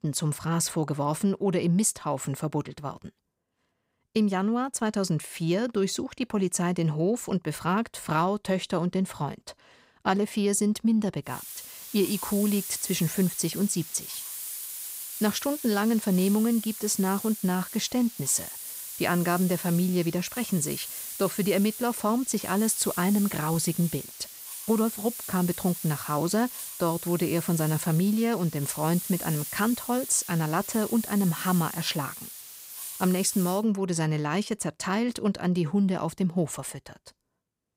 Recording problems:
hiss; loud; from 11 to 34 s; 9 dB below the speech

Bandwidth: 15.5 kHz